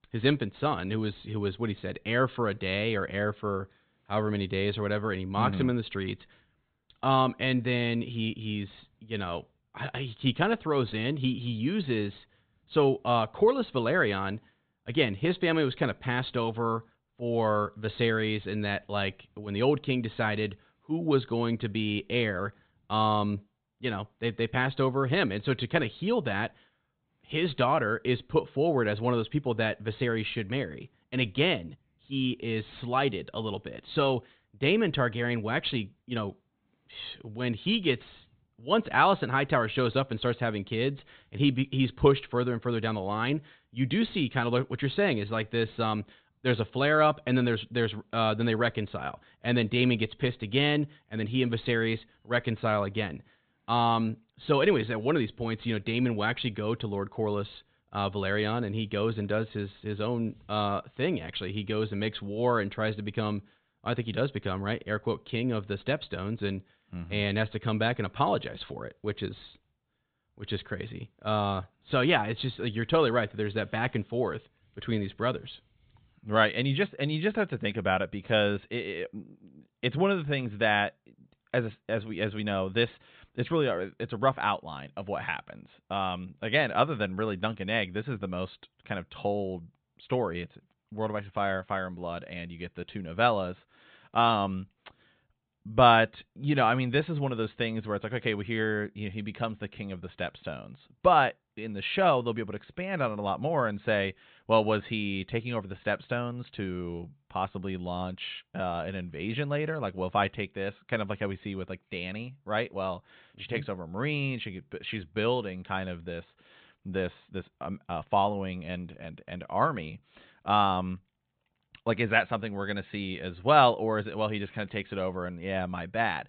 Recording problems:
high frequencies cut off; severe; nothing above 4 kHz

